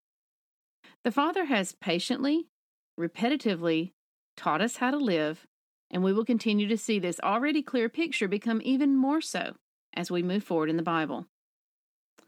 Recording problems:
none

